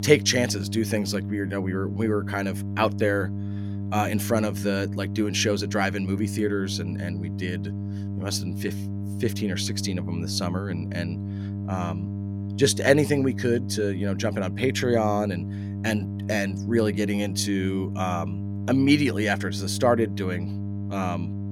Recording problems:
electrical hum; noticeable; throughout; 50 Hz, 15 dB below the speech

